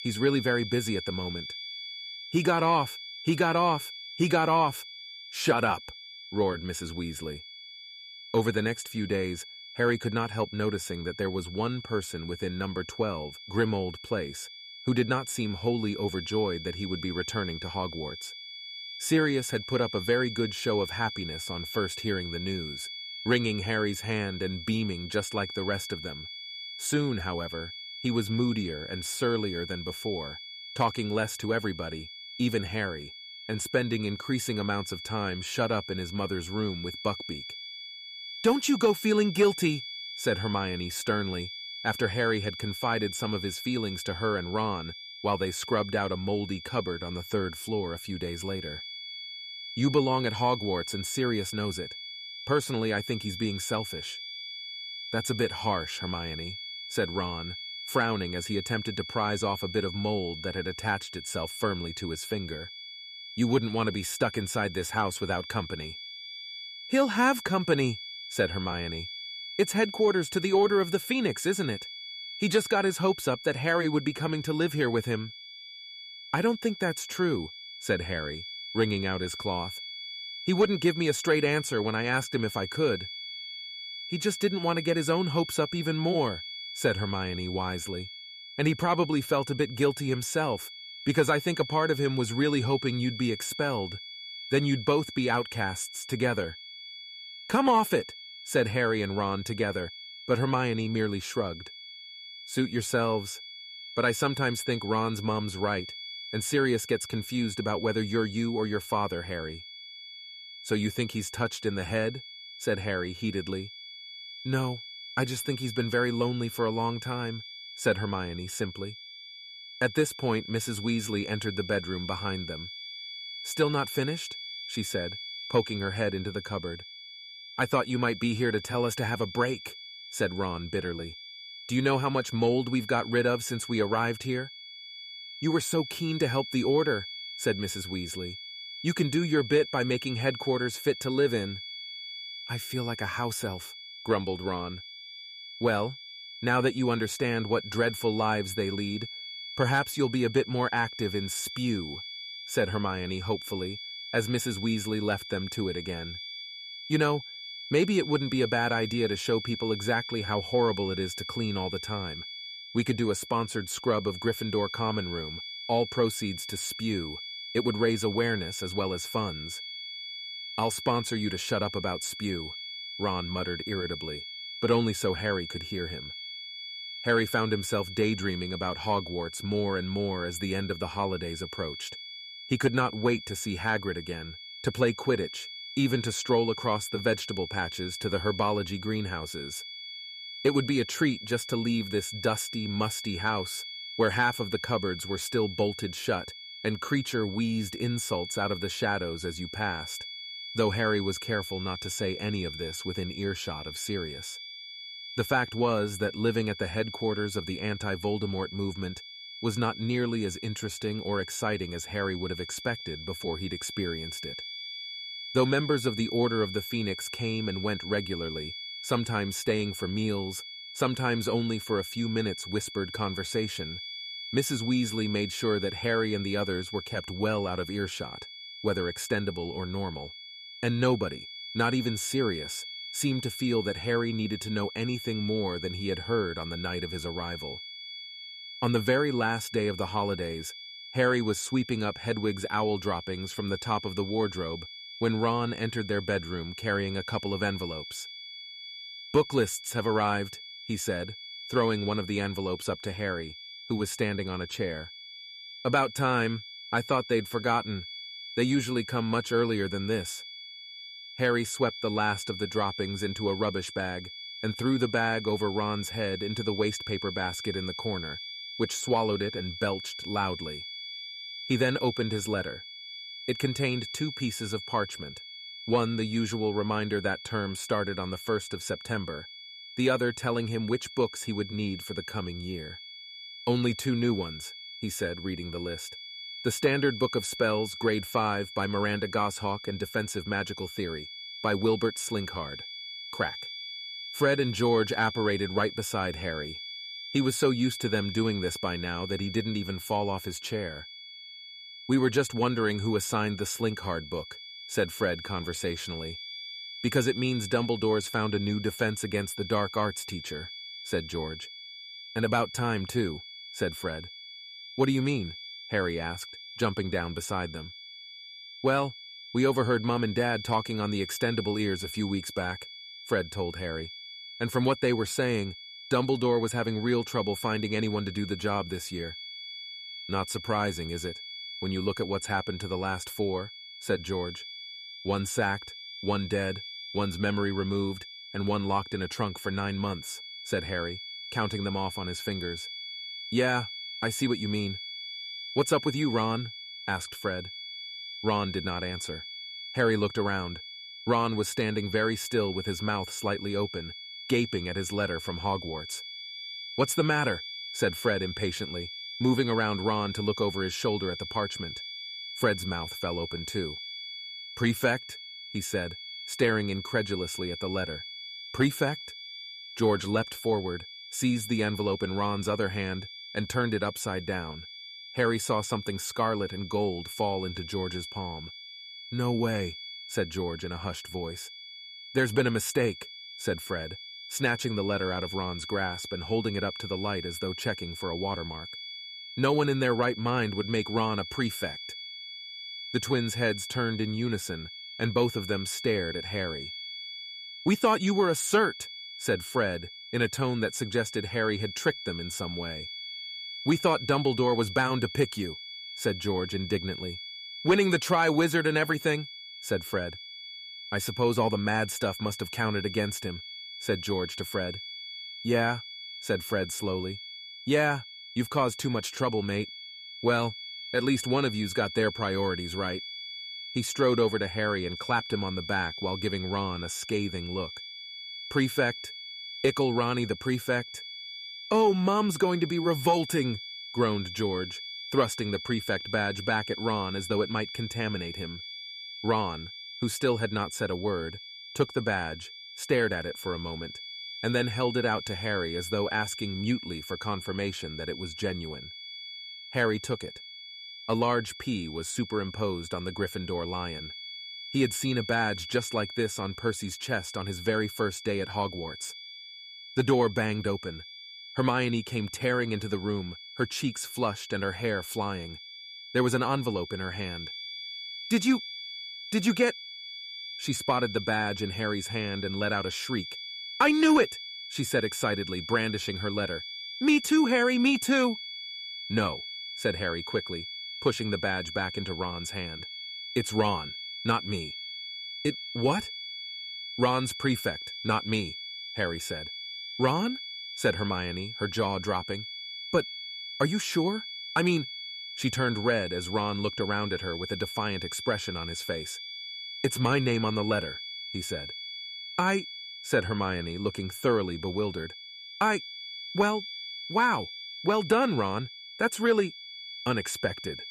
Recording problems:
high-pitched whine; loud; throughout; 3.5 kHz, 9 dB below the speech

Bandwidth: 14.5 kHz